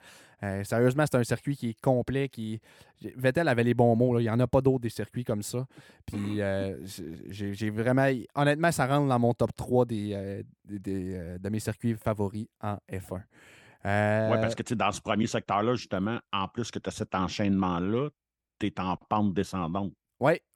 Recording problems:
none

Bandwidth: 18 kHz